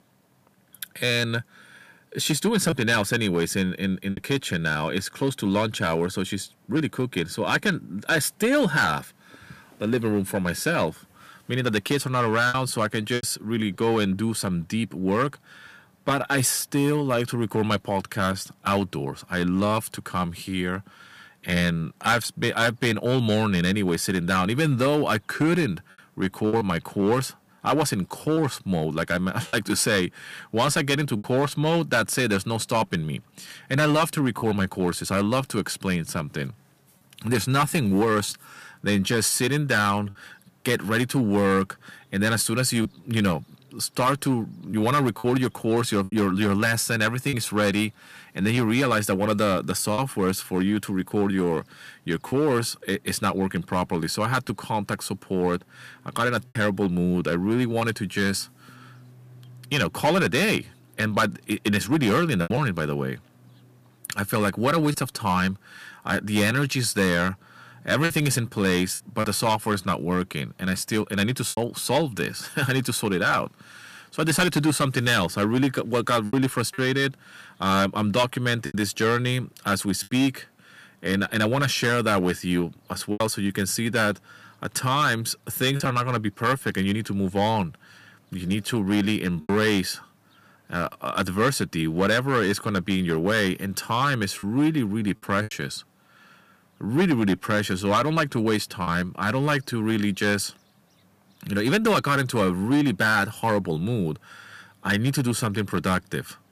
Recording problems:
distortion; slight; 4% of the sound clipped
choppy; occasionally; 2% of the speech affected

